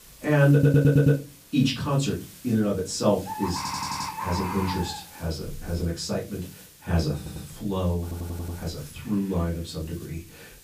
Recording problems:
off-mic speech; far
room echo; slight; dies away in 0.3 s
animal sounds; loud; throughout; 9 dB below the speech
hiss; faint; throughout; 20 dB below the speech
audio stuttering; 4 times, first at 0.5 s

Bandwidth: 15 kHz